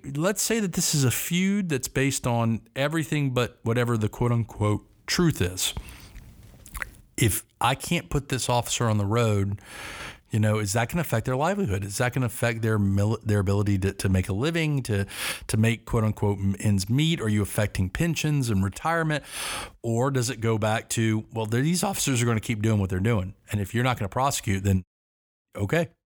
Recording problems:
none

